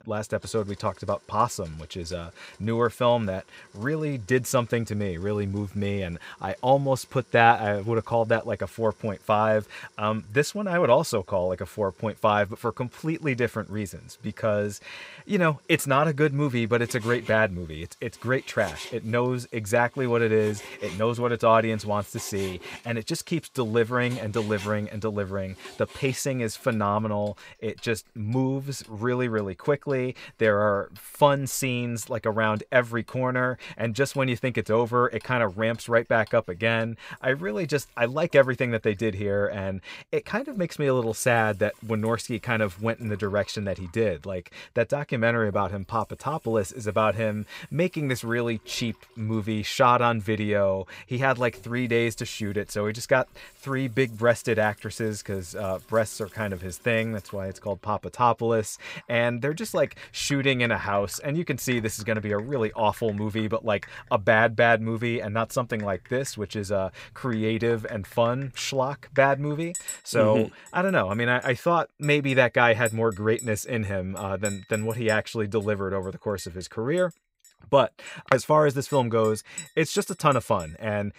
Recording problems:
household noises; faint; throughout; 20 dB below the speech

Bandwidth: 15.5 kHz